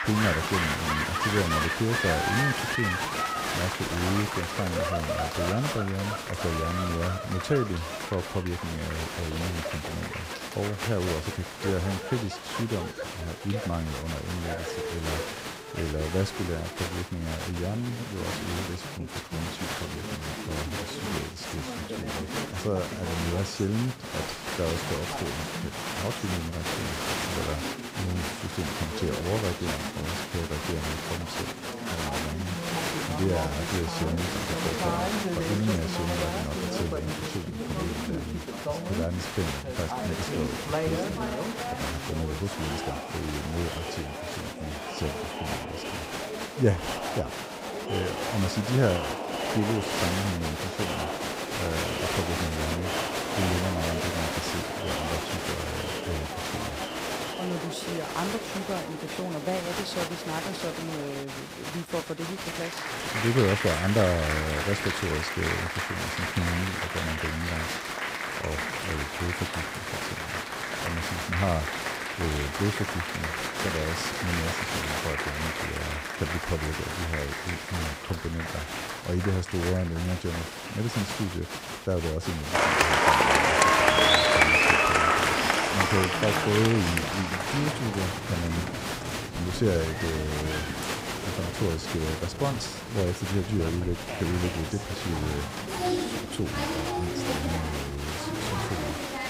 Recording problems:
crowd noise; very loud; throughout; 2 dB above the speech

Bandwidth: 15.5 kHz